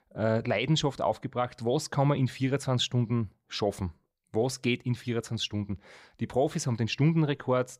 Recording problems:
none

